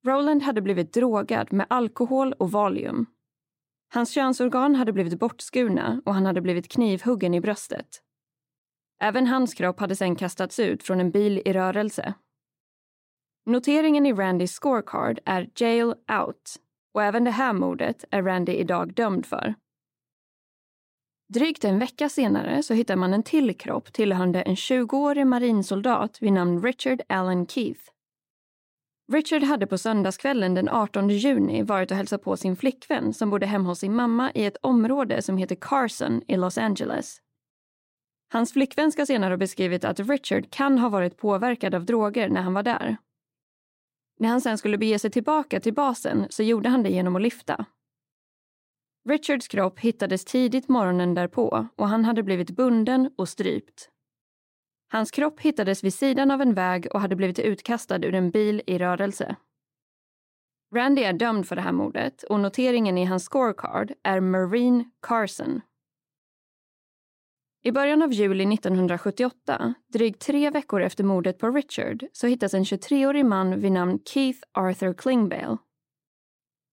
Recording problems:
none

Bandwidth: 16 kHz